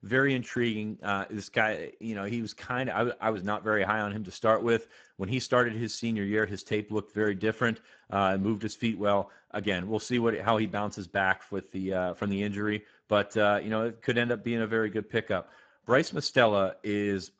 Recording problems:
garbled, watery; badly; nothing above 7.5 kHz

